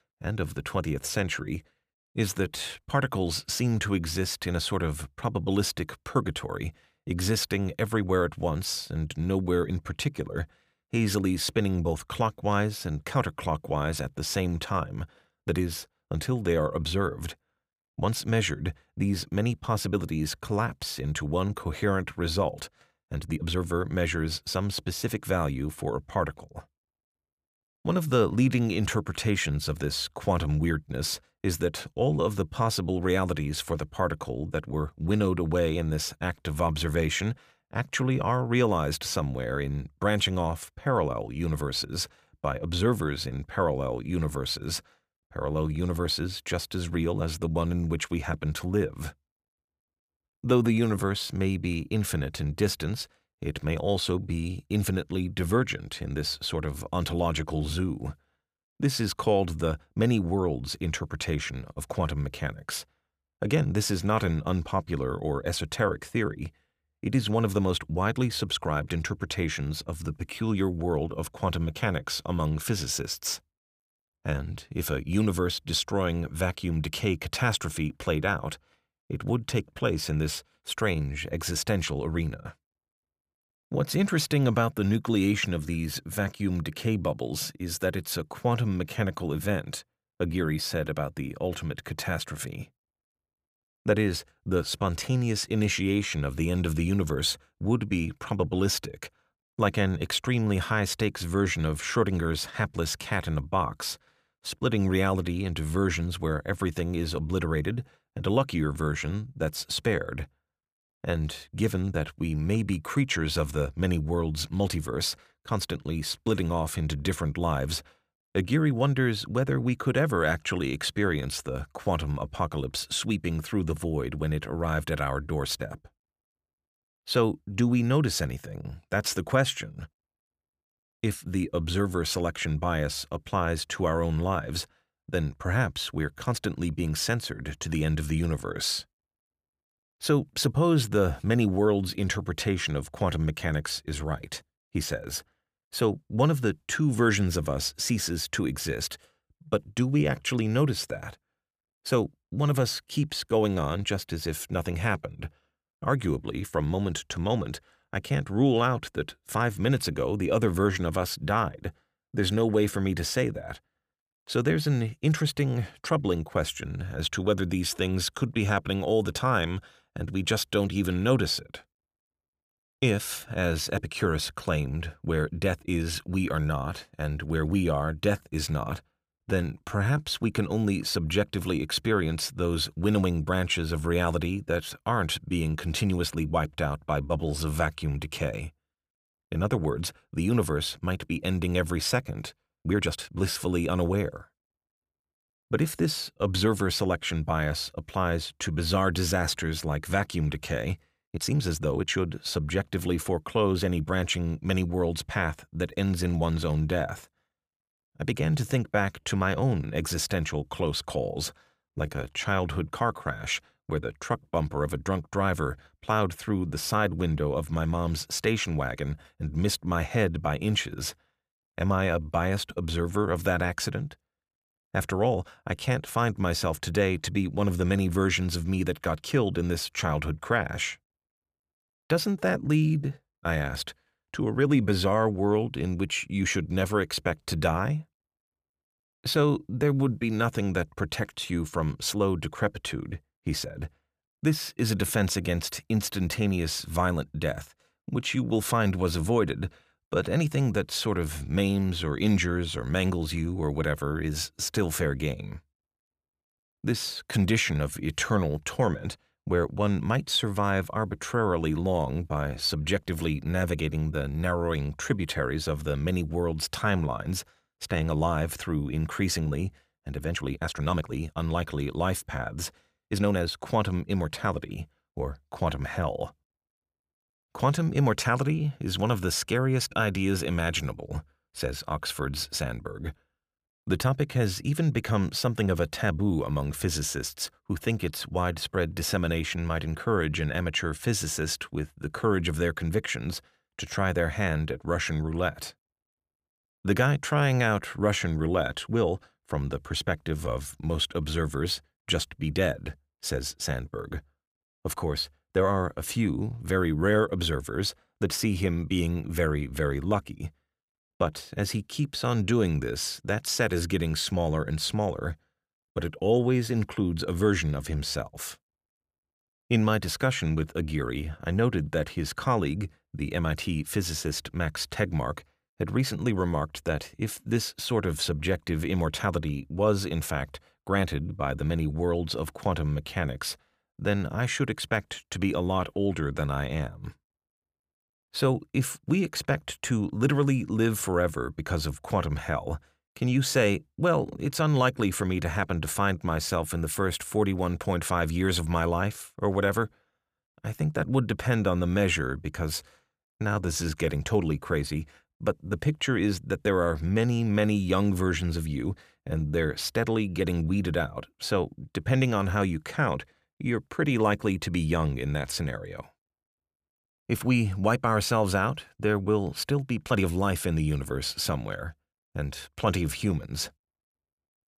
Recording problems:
uneven, jittery; strongly; from 2.5 s to 6:10

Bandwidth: 15 kHz